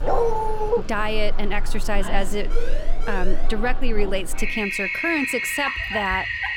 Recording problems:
household noises; loud; throughout; 1 dB below the speech
dog barking; loud; at the start; peak 5 dB above the speech
siren; noticeable; at 2.5 s; peak 6 dB below the speech
dog barking; noticeable; at 5.5 s; peak 7 dB below the speech

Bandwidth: 17 kHz